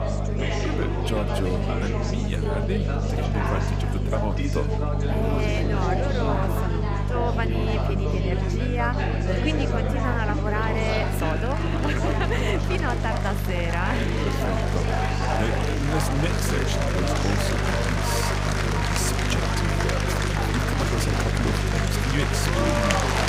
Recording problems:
chatter from many people; very loud; throughout; 2 dB above the speech
electrical hum; loud; throughout; 50 Hz, 8 dB below the speech

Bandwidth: 15.5 kHz